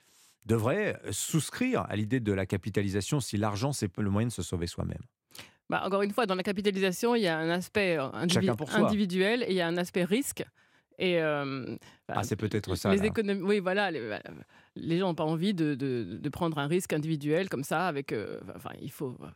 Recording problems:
none

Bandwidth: 16.5 kHz